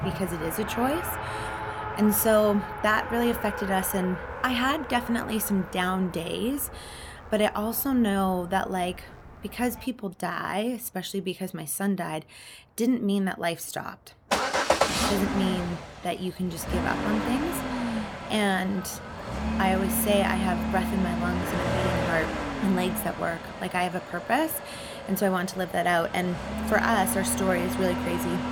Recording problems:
traffic noise; loud; throughout; 4 dB below the speech

